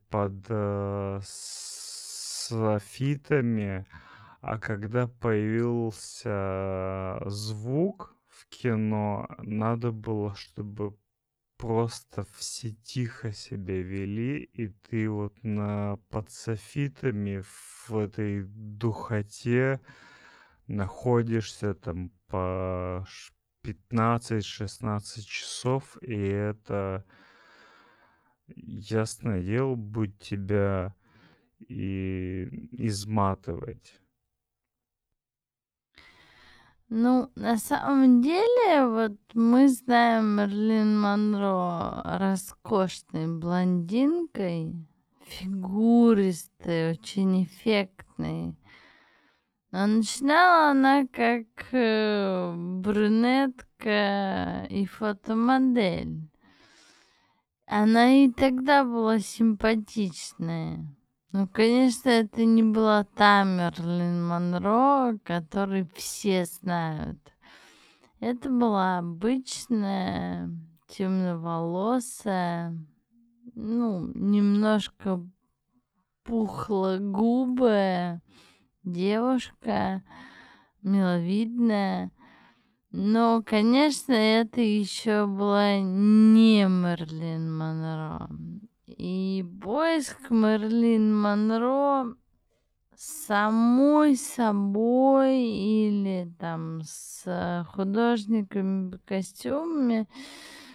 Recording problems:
wrong speed, natural pitch; too slow; 0.5 times normal speed

